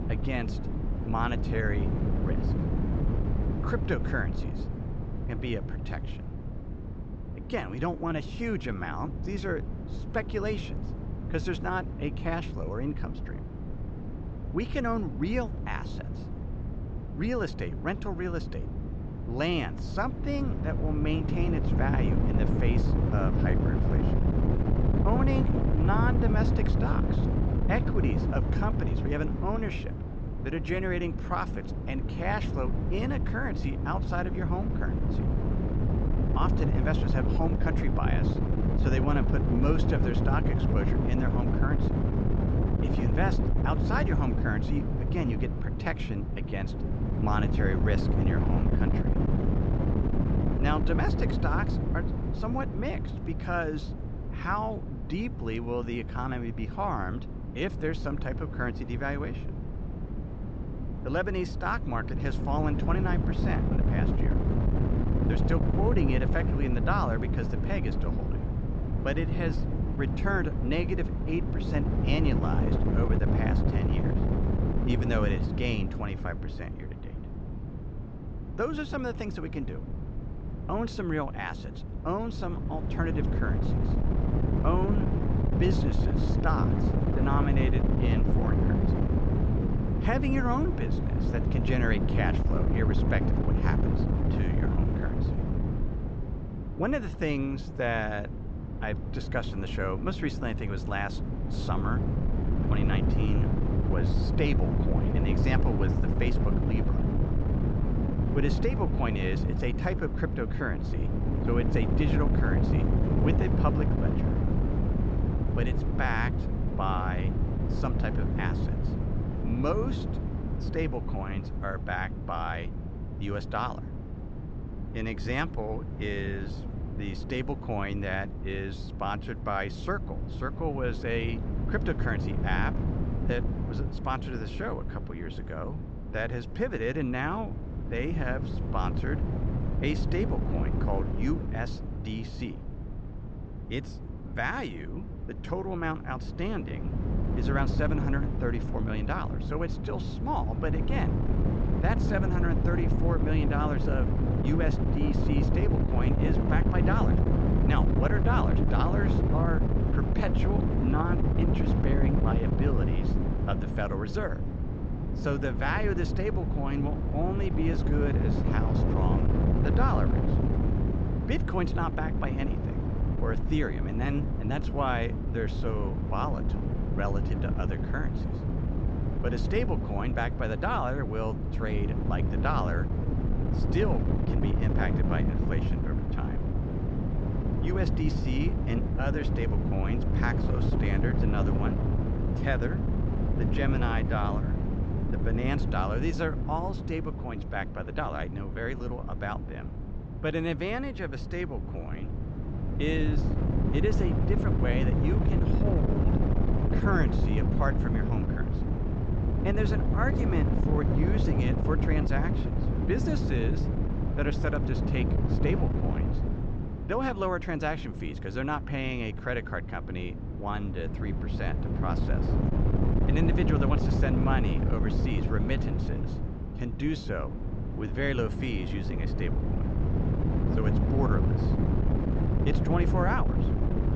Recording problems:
high frequencies cut off; noticeable; nothing above 8 kHz
wind noise on the microphone; heavy; 4 dB below the speech

